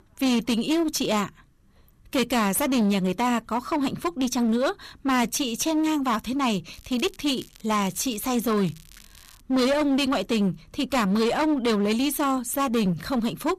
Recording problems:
distortion; slight; 17% of the sound clipped
crackling; faint; from 6.5 to 9.5 s; 25 dB below the speech

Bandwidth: 14.5 kHz